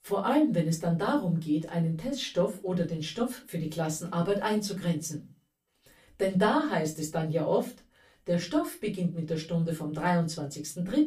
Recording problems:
room echo; very slight; dies away in 0.2 s
off-mic speech; somewhat distant

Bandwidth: 15 kHz